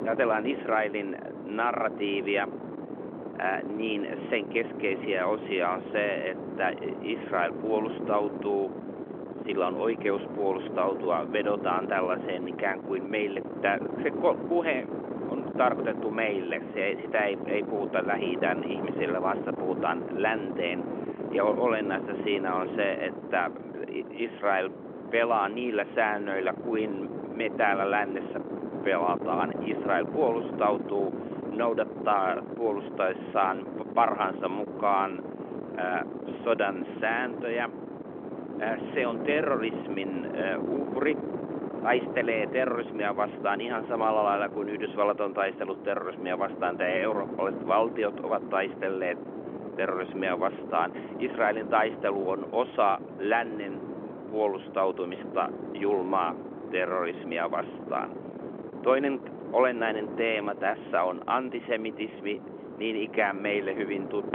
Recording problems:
phone-call audio
wind noise on the microphone; occasional gusts; 10 dB below the speech

